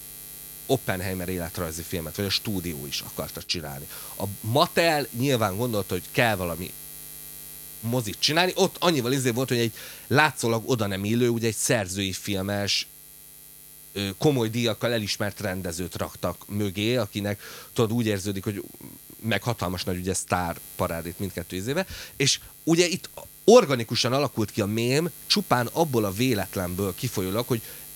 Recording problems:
electrical hum; noticeable; throughout; 60 Hz, 20 dB below the speech

